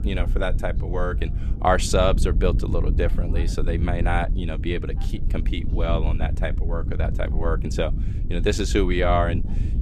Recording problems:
wind noise on the microphone; occasional gusts; 15 dB below the speech
voice in the background; faint; throughout; 30 dB below the speech

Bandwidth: 13.5 kHz